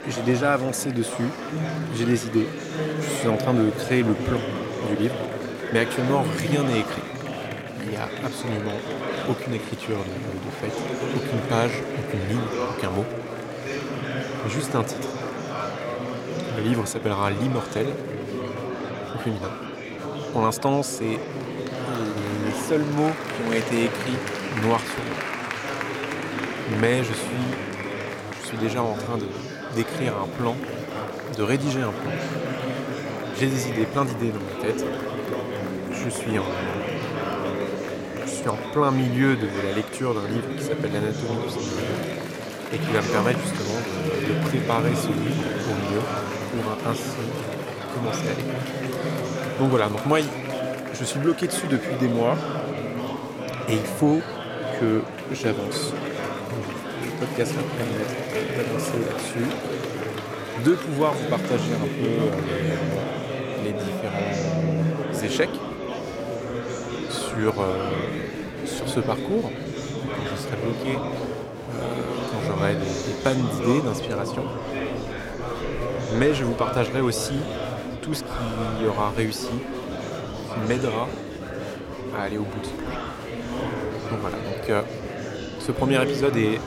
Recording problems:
murmuring crowd; loud; throughout; 3 dB below the speech

